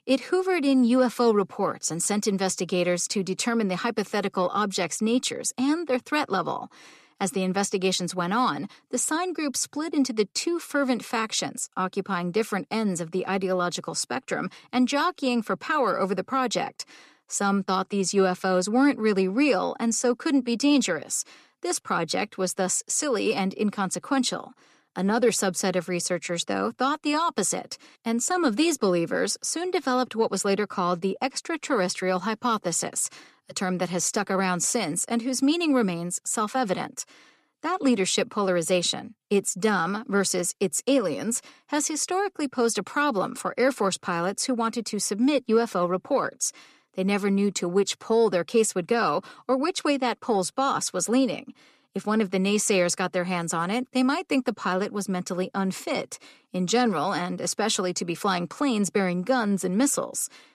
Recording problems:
none

